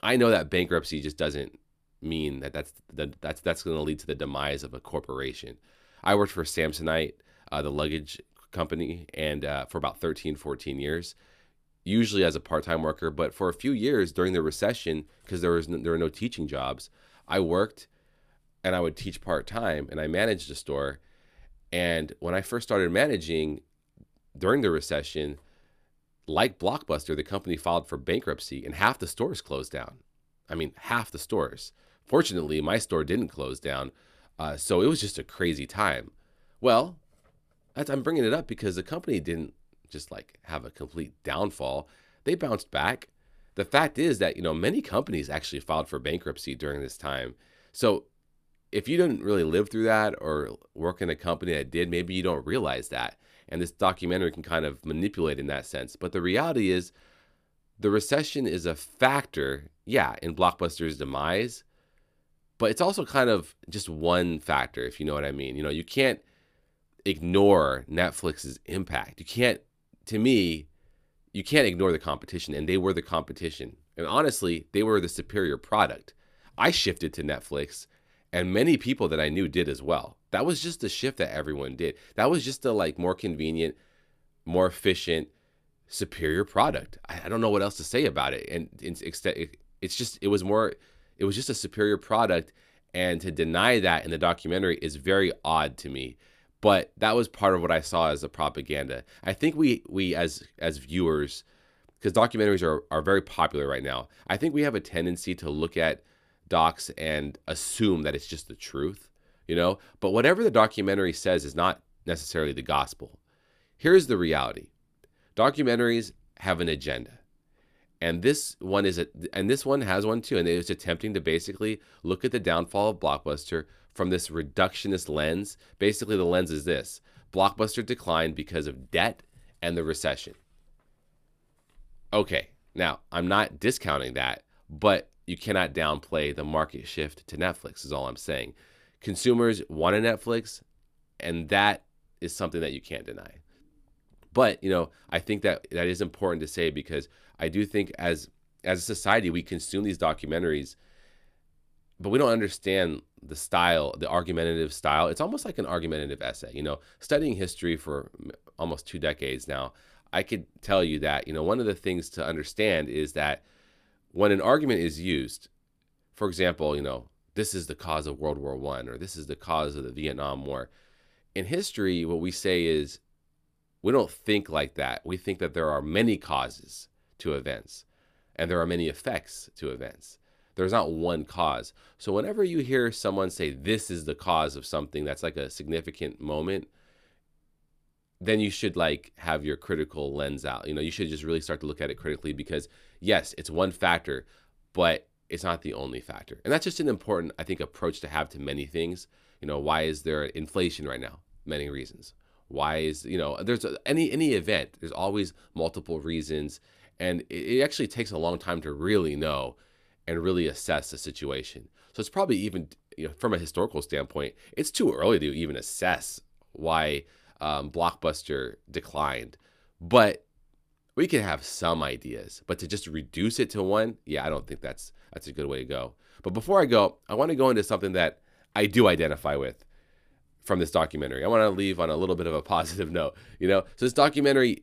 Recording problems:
none

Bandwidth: 14.5 kHz